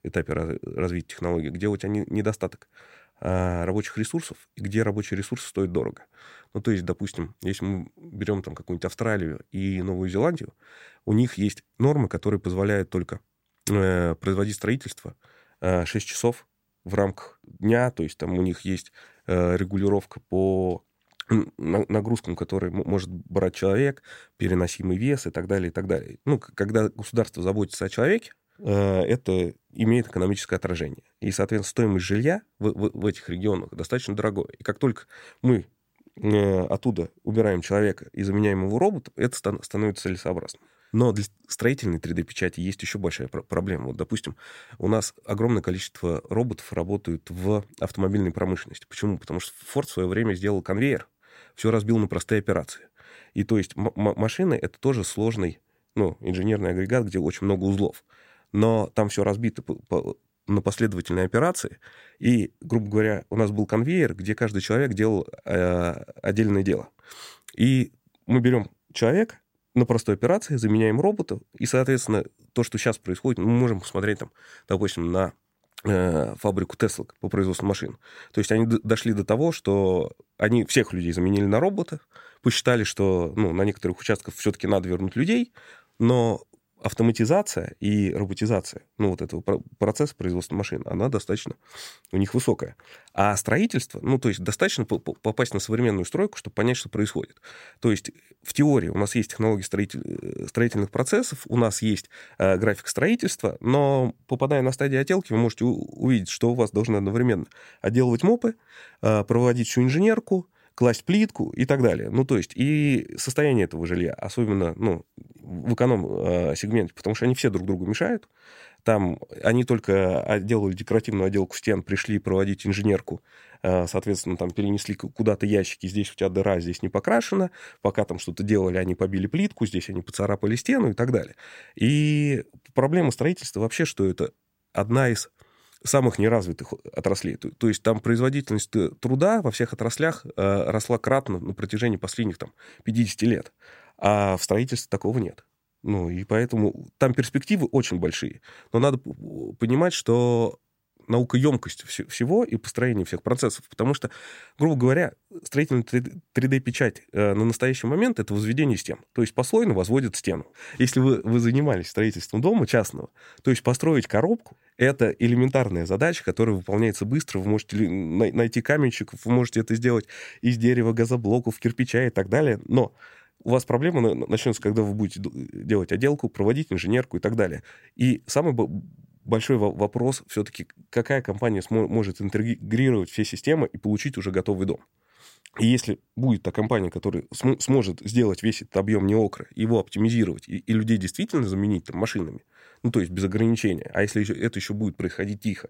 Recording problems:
none

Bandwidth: 16 kHz